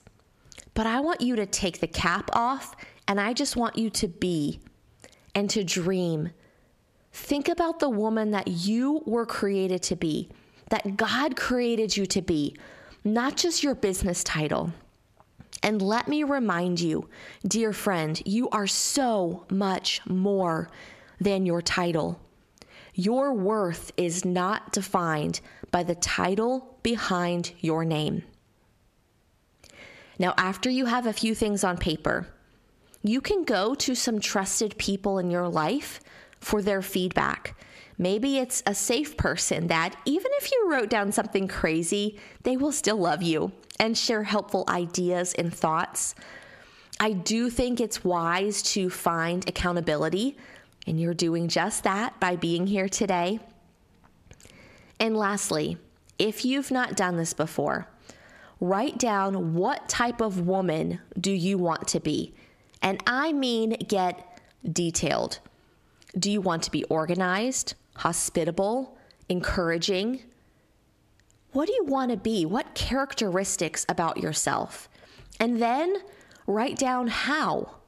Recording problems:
squashed, flat; heavily

